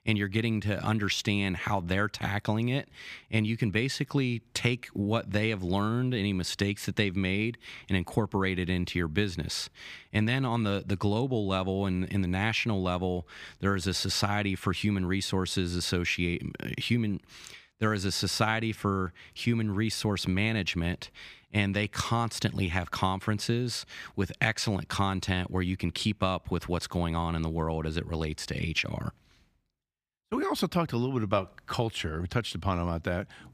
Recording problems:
none

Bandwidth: 15 kHz